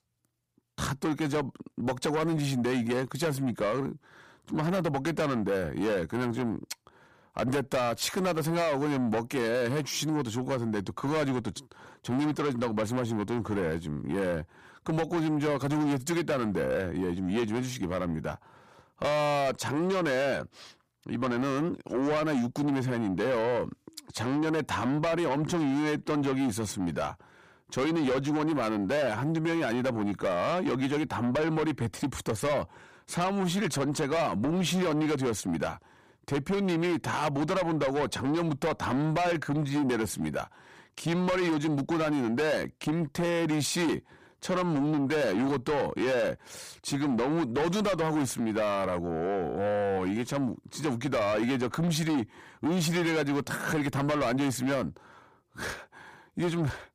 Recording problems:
distortion; heavy; 7 dB below the speech

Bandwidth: 15 kHz